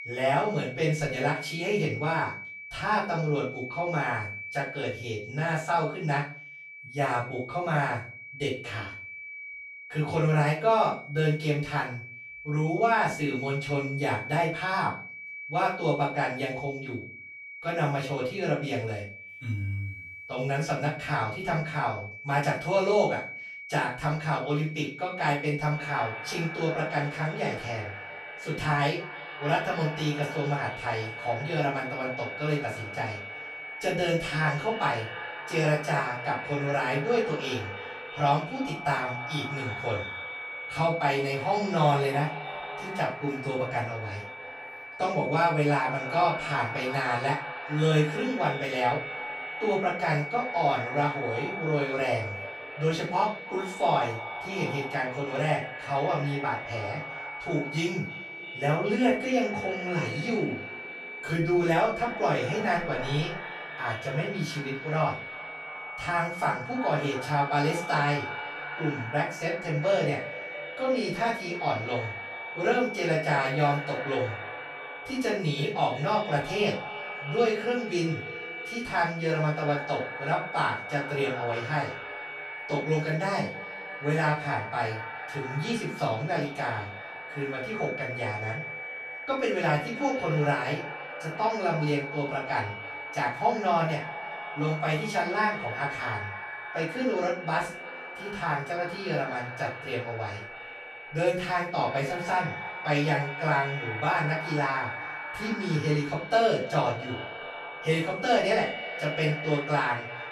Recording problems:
echo of what is said; strong; from 26 s on; 320 ms later, 10 dB below the speech
off-mic speech; far
room echo; slight; dies away in 0.3 s
high-pitched whine; loud; throughout; 2.5 kHz, 10 dB below the speech

